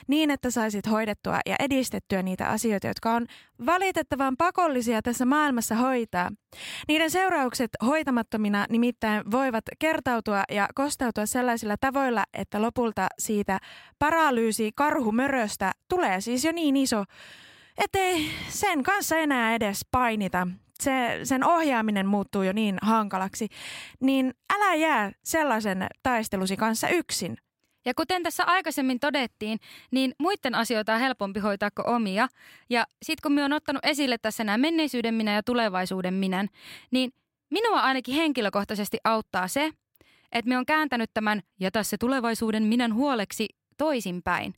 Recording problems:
none

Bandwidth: 16 kHz